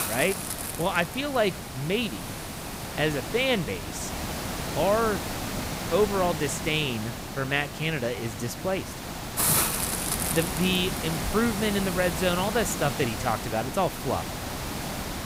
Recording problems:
hiss; loud; throughout; 3 dB below the speech

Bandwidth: 15.5 kHz